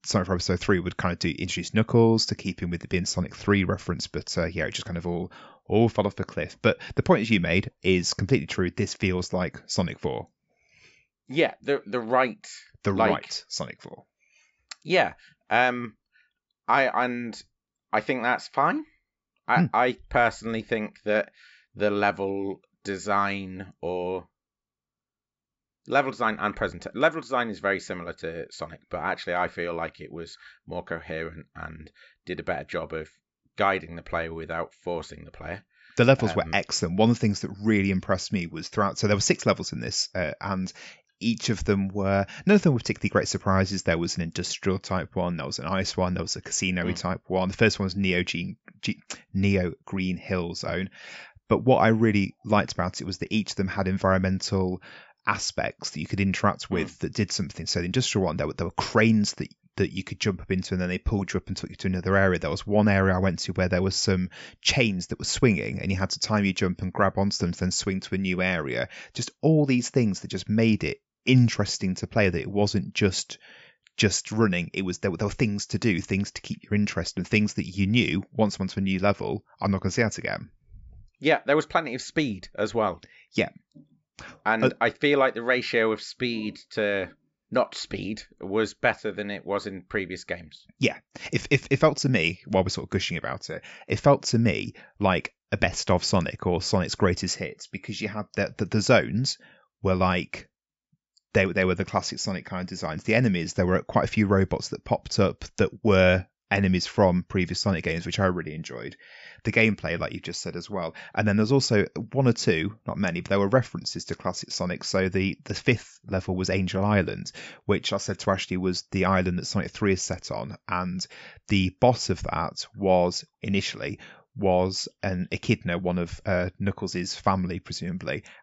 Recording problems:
high frequencies cut off; noticeable; nothing above 8 kHz

